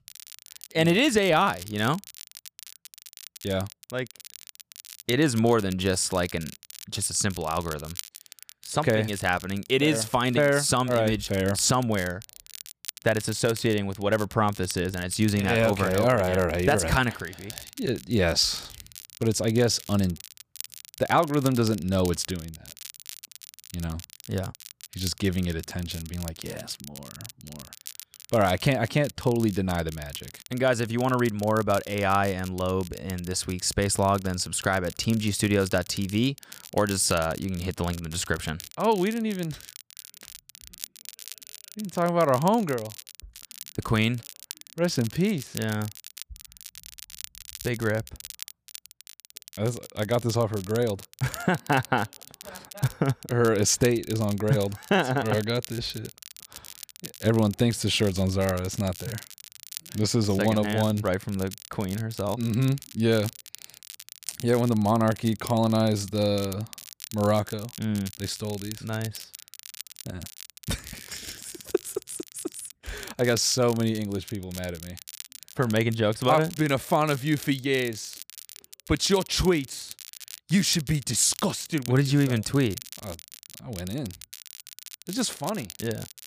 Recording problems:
crackle, like an old record; noticeable; 15 dB below the speech

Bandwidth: 15 kHz